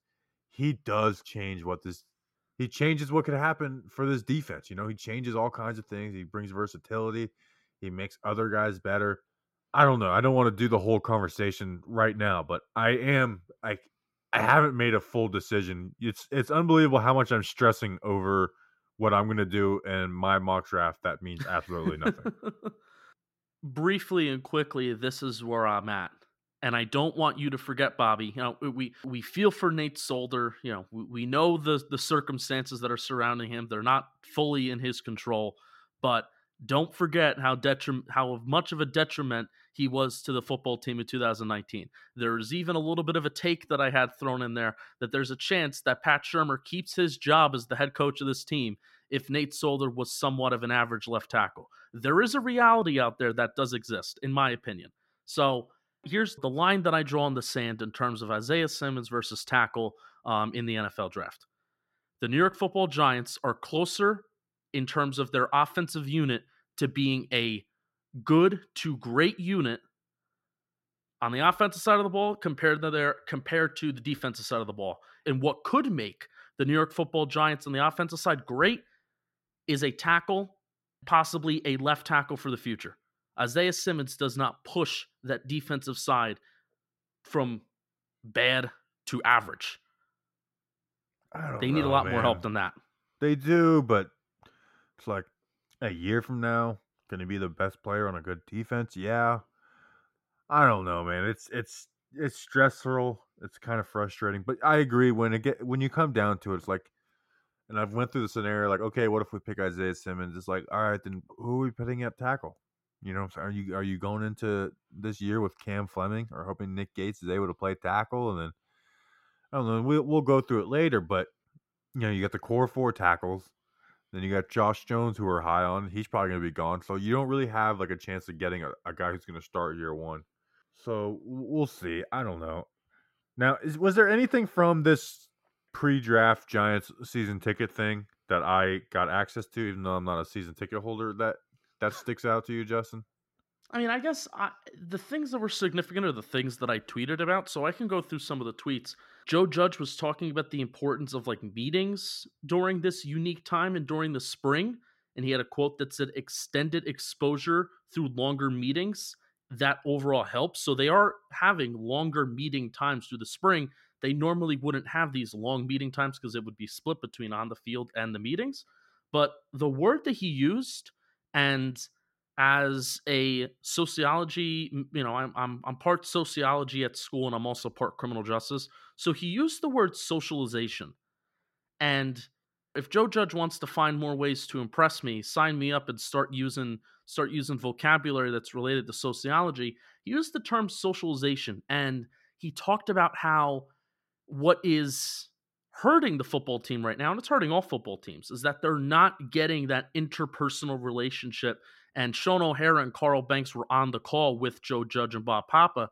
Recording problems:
muffled; slightly; fading above 2.5 kHz

